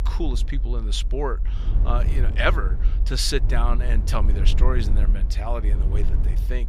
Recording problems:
low rumble; noticeable; throughout; 15 dB below the speech

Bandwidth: 15.5 kHz